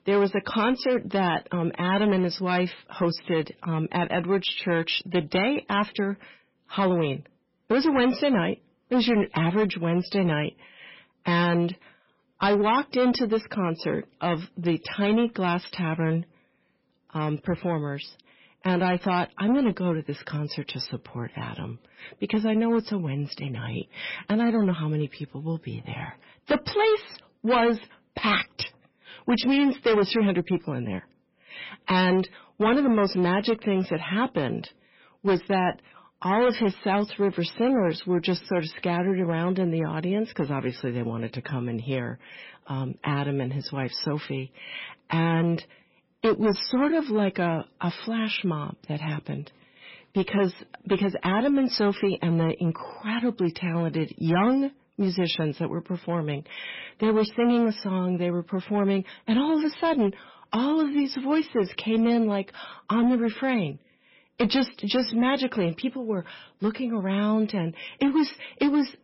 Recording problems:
garbled, watery; badly; nothing above 5.5 kHz
distortion; slight; 6% of the sound clipped

